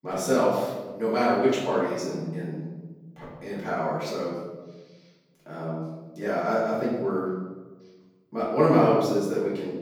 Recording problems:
off-mic speech; far
room echo; noticeable; dies away in 1.3 s

